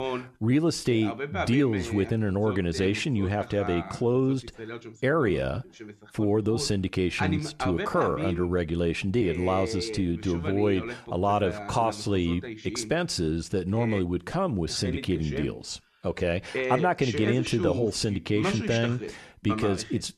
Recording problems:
voice in the background; loud; throughout; 8 dB below the speech

